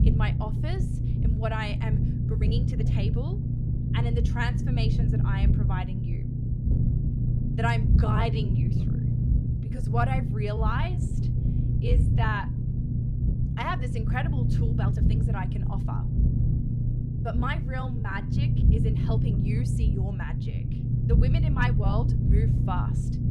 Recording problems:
low rumble; loud; throughout; 4 dB below the speech
uneven, jittery; strongly; from 2.5 to 22 s

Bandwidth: 14.5 kHz